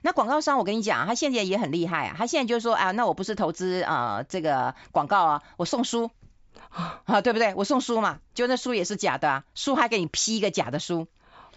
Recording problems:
high frequencies cut off; noticeable; nothing above 7.5 kHz

